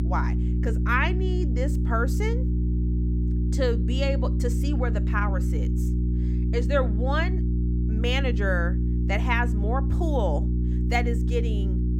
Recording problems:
electrical hum; loud; throughout; 60 Hz, 8 dB below the speech

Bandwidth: 16 kHz